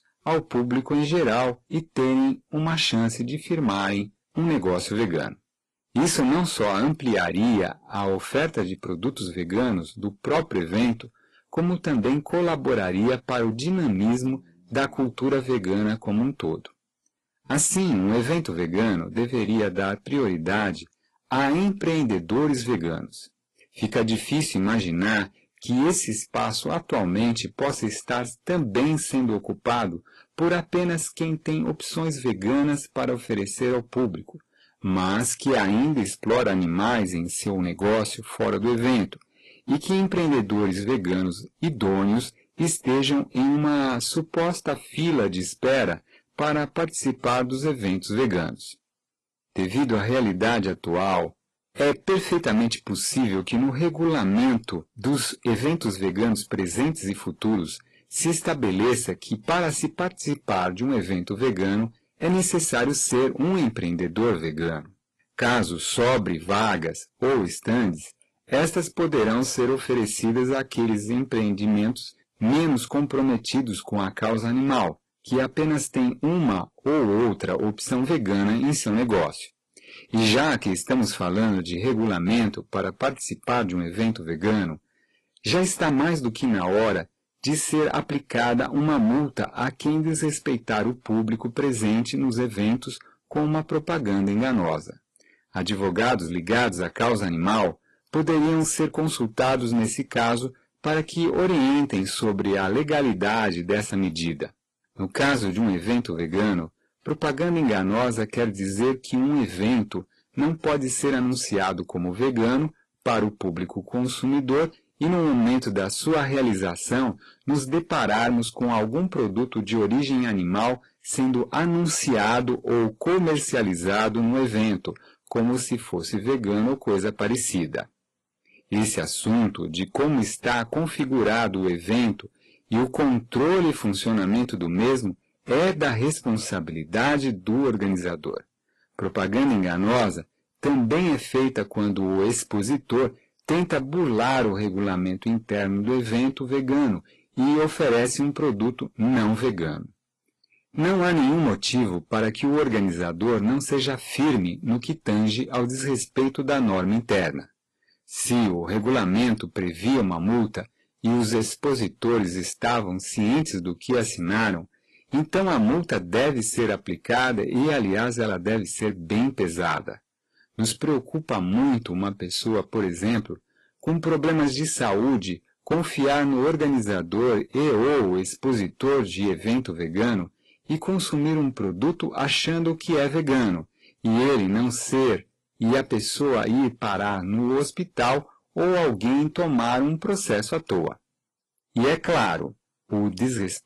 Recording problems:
distortion; heavy; 12% of the sound clipped
garbled, watery; slightly; nothing above 11.5 kHz

